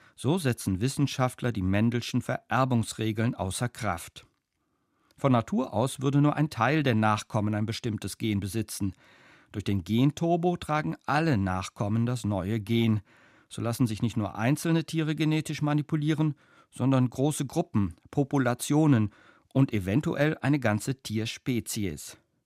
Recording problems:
none

